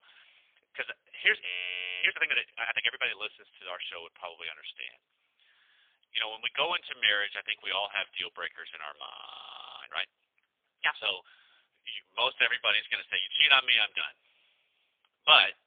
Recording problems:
phone-call audio; poor line; nothing above 3.5 kHz
thin; very; fading below 550 Hz
audio freezing; at 1.5 s for 0.5 s and at 9 s for 0.5 s

